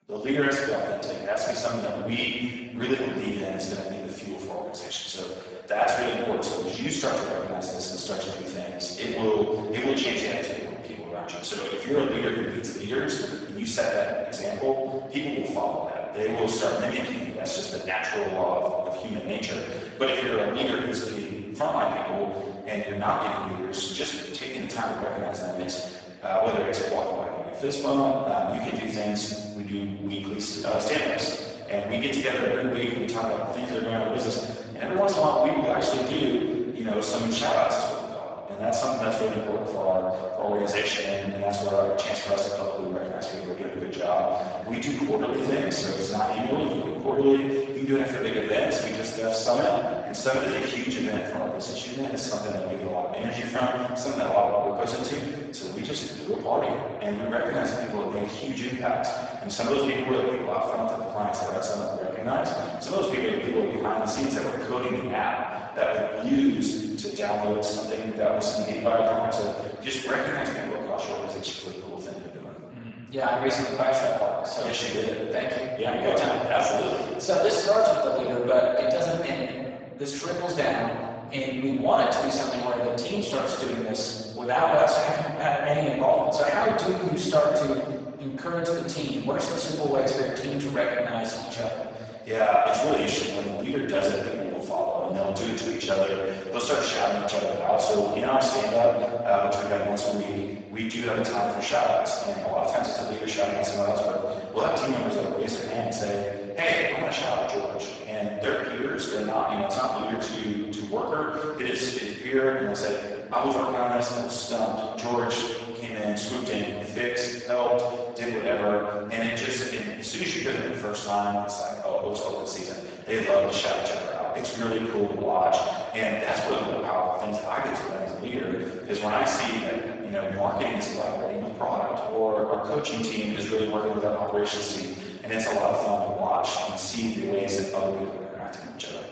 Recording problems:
room echo; strong; dies away in 1.7 s
off-mic speech; far
garbled, watery; badly; nothing above 7.5 kHz
thin; somewhat; fading below 900 Hz

